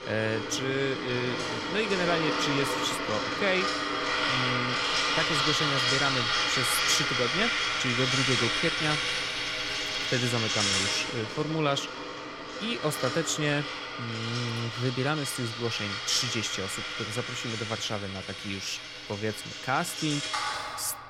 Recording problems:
household noises; very loud; throughout; 2 dB above the speech

